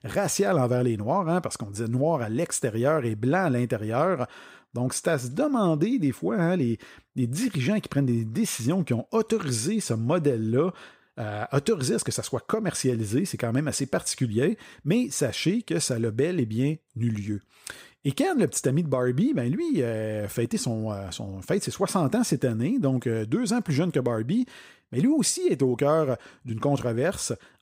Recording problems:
none

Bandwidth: 15.5 kHz